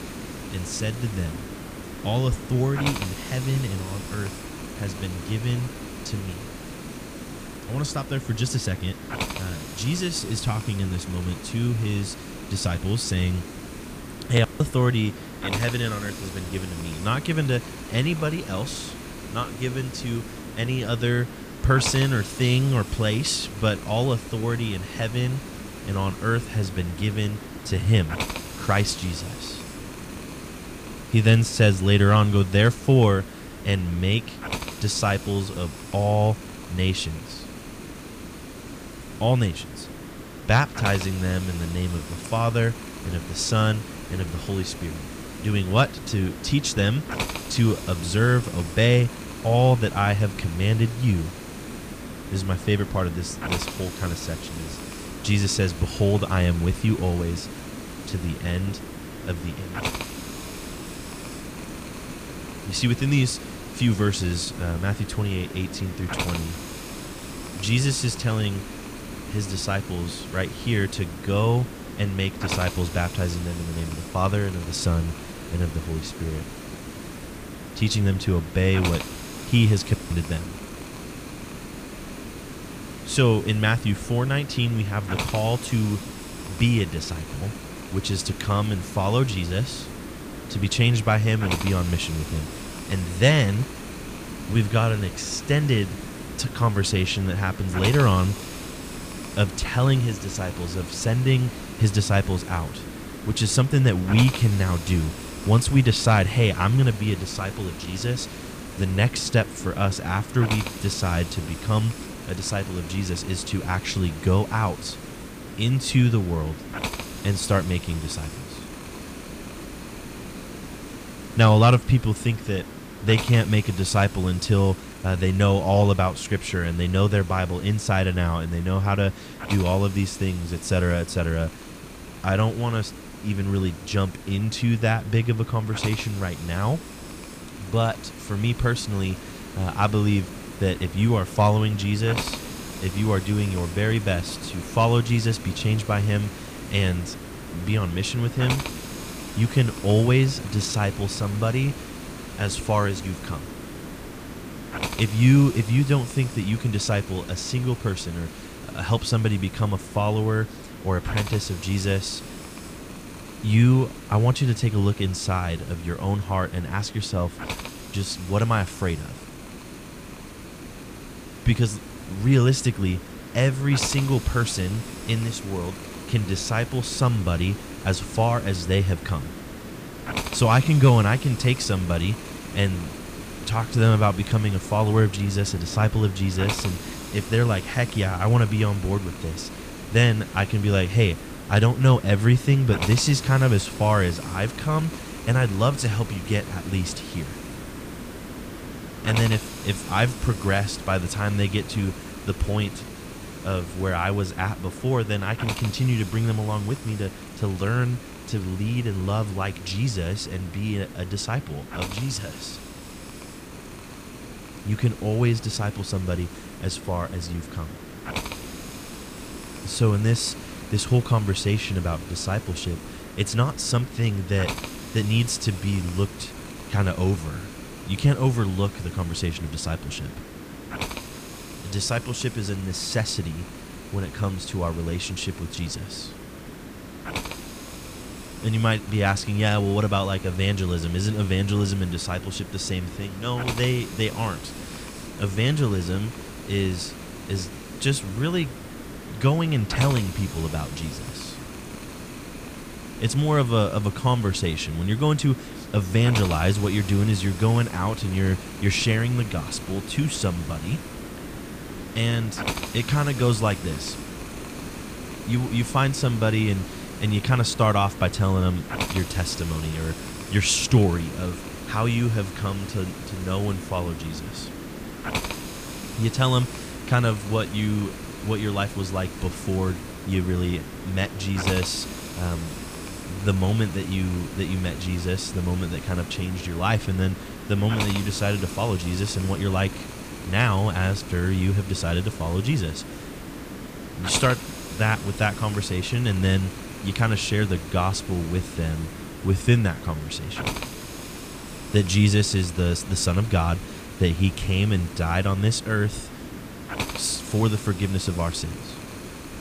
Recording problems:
hiss; noticeable; throughout; 10 dB below the speech

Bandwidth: 15 kHz